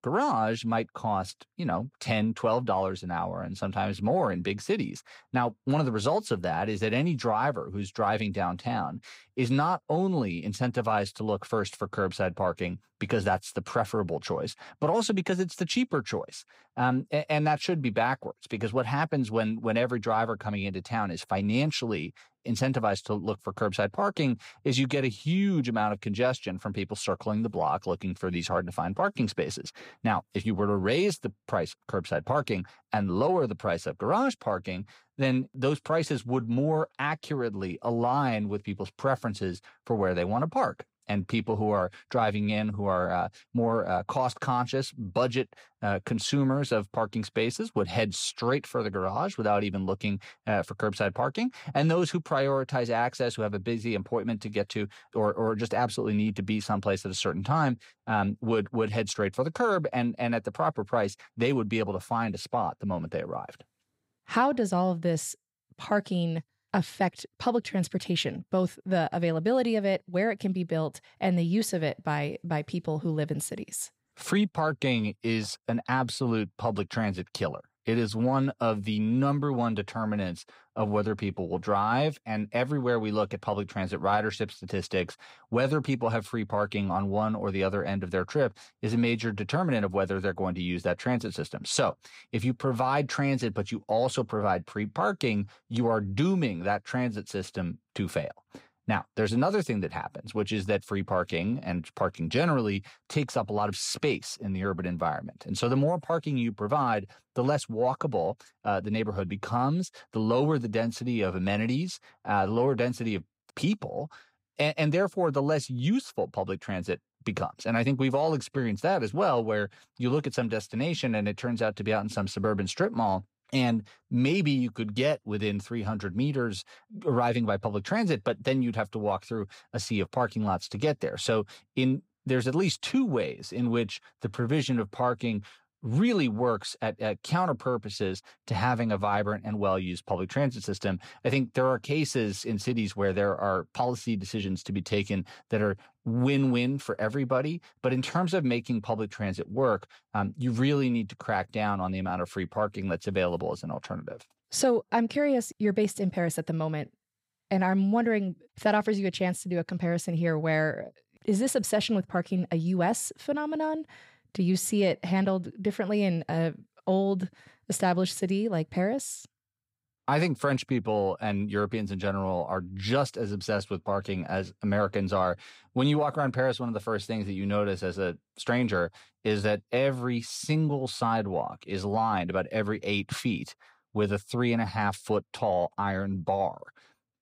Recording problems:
none

